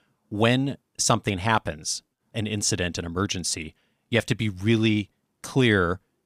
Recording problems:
none

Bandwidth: 15 kHz